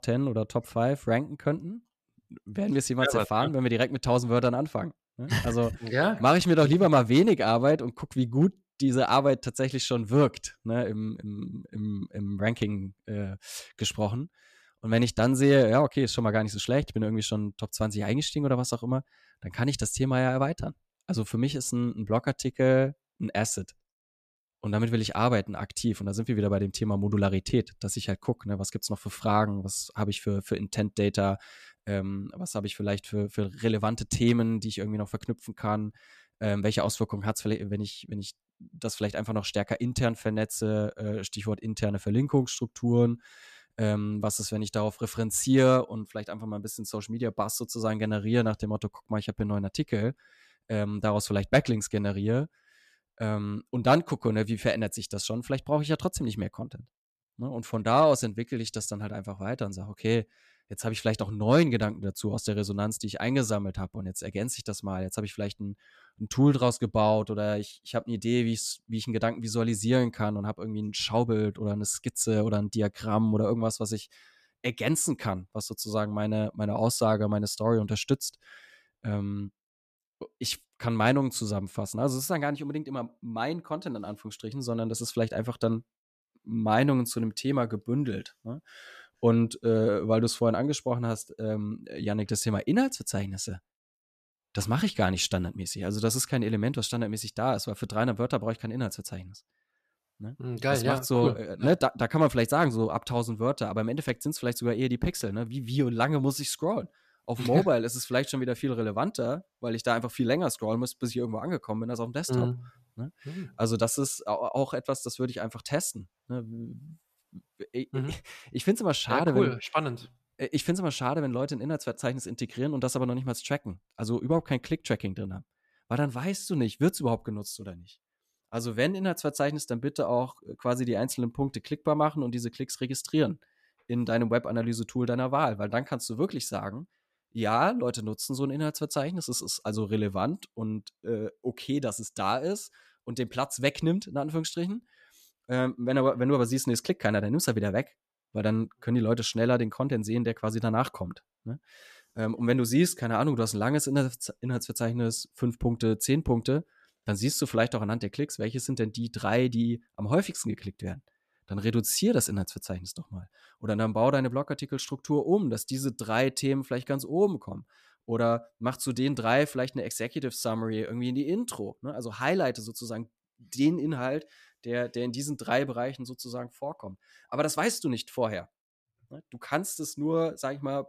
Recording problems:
none

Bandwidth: 14.5 kHz